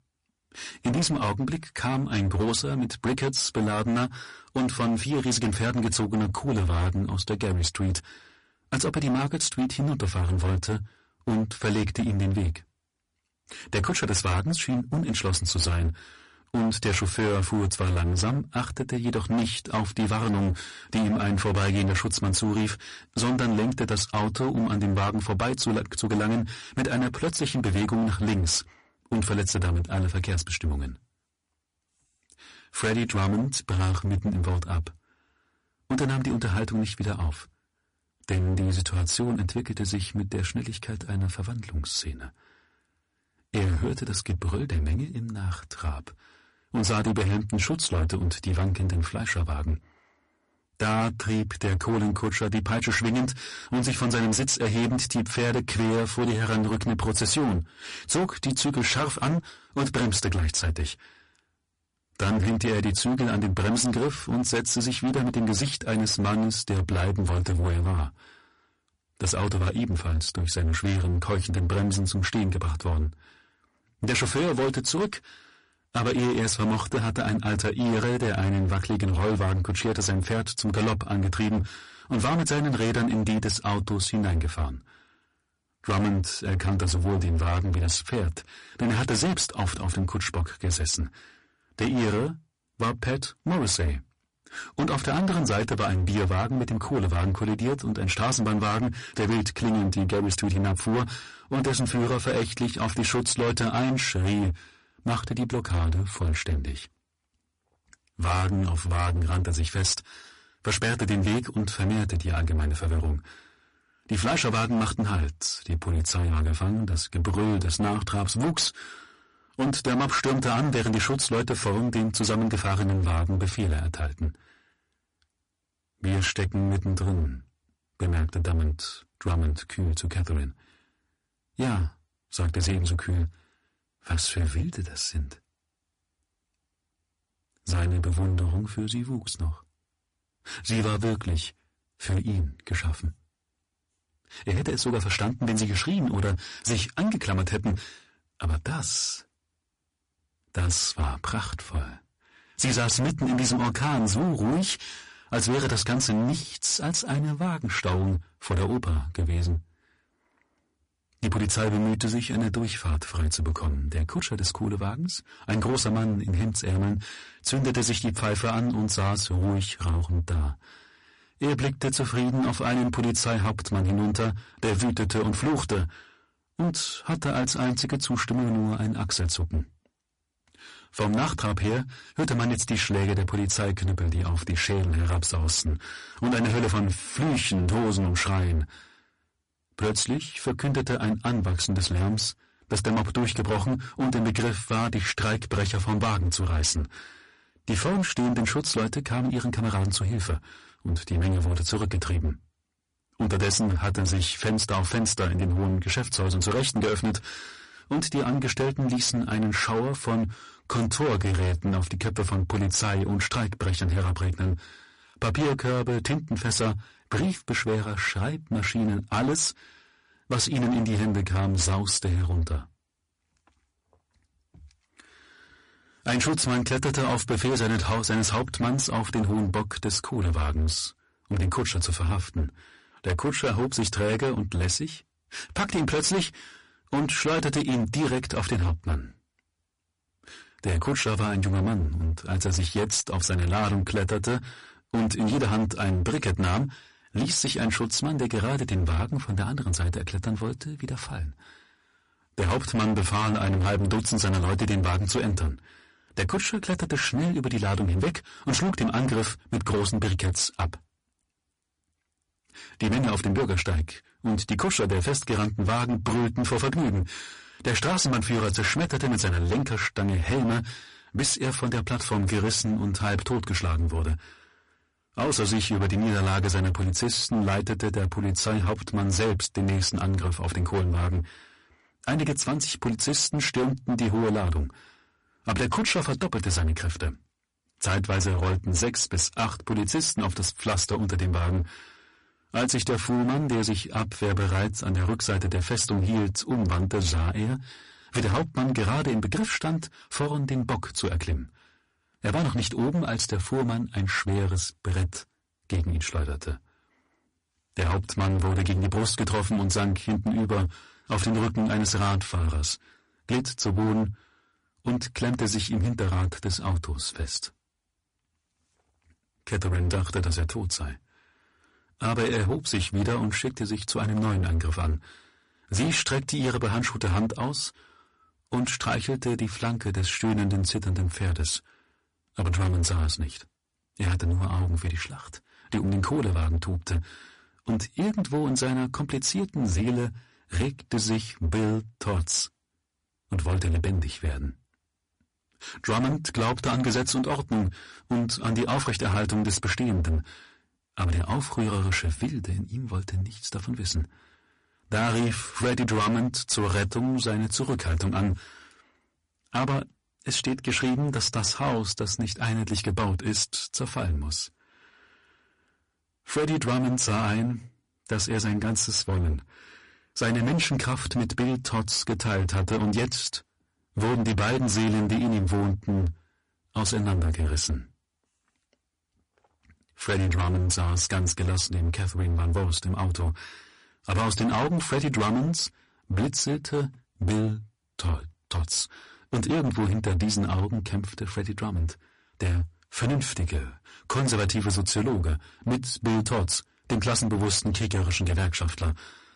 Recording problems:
distortion; heavy; 21% of the sound clipped
garbled, watery; slightly; nothing above 10.5 kHz

